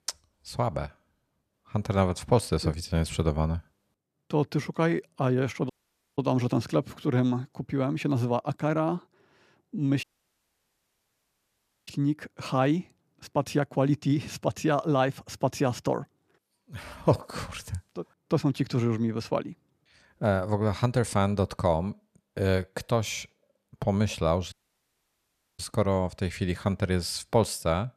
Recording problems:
audio cutting out; at 5.5 s, at 10 s for 2 s and at 25 s for 1 s

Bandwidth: 14.5 kHz